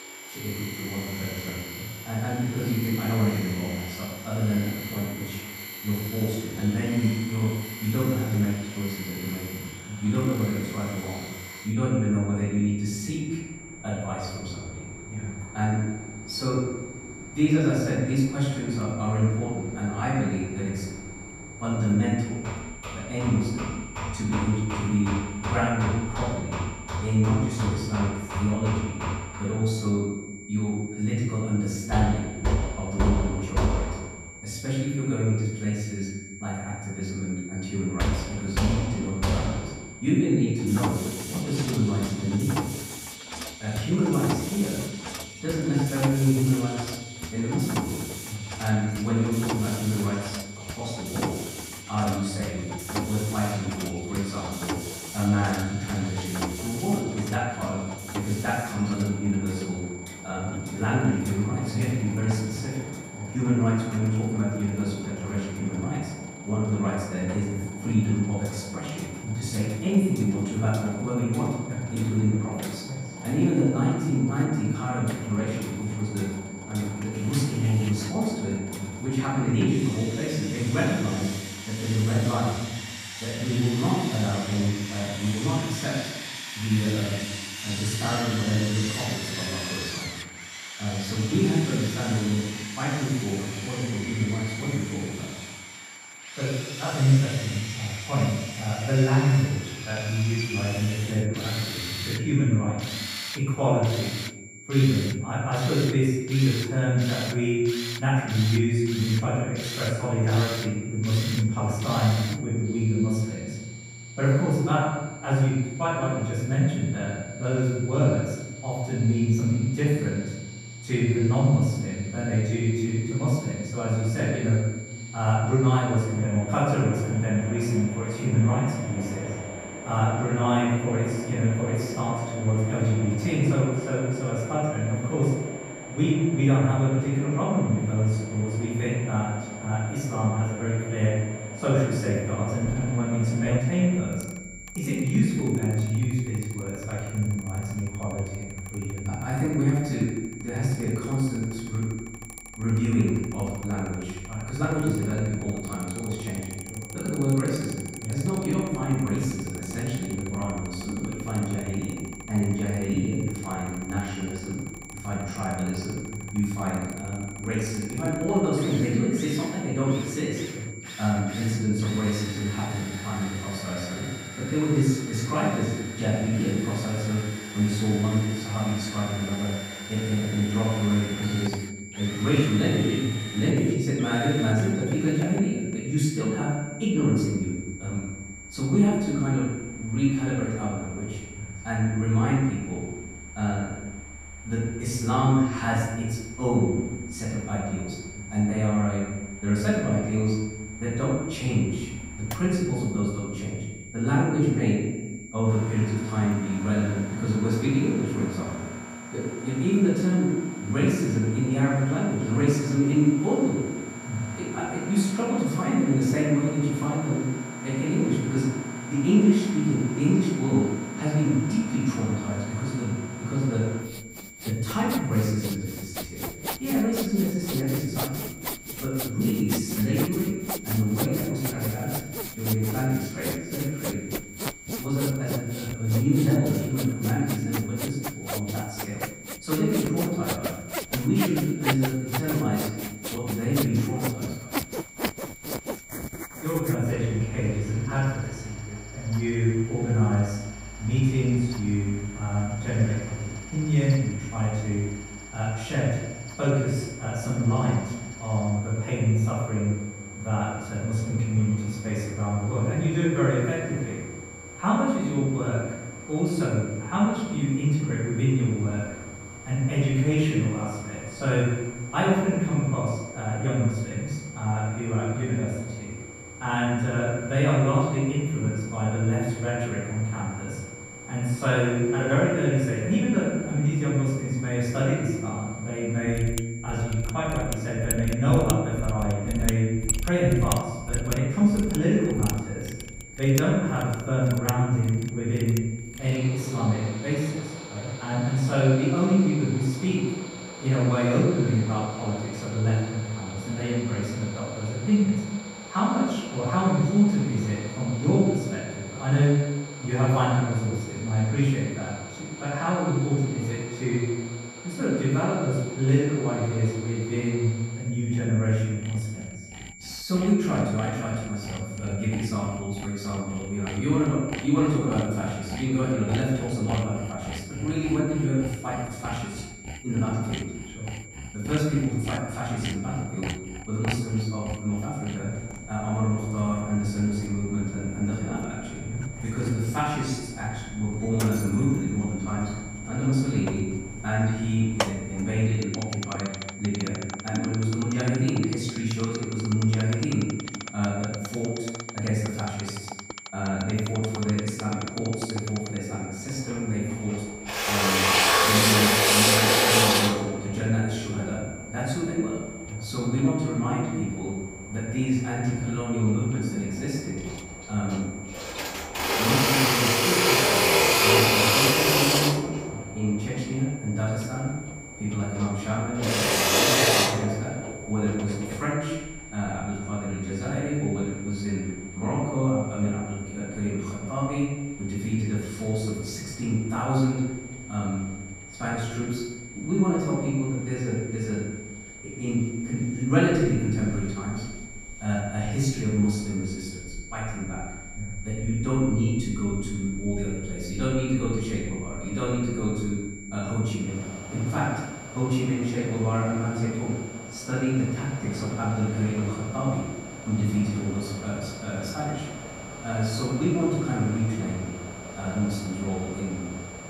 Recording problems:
off-mic speech; far
room echo; noticeable; dies away in 1 s
machinery noise; loud; throughout; 6 dB below the speech
high-pitched whine; noticeable; throughout; 2.5 kHz, 15 dB below the speech

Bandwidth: 15.5 kHz